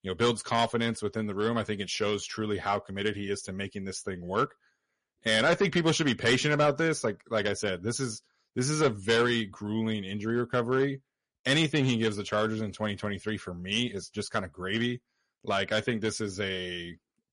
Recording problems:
distortion; slight; 2% of the sound clipped
garbled, watery; slightly; nothing above 10.5 kHz

